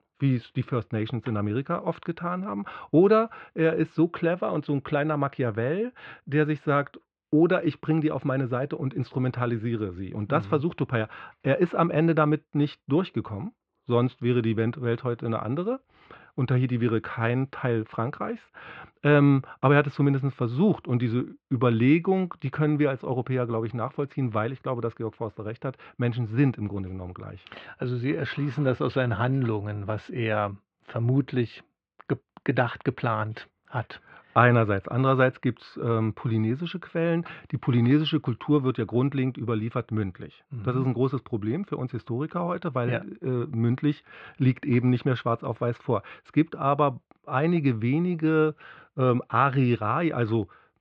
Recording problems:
muffled; very; fading above 3 kHz

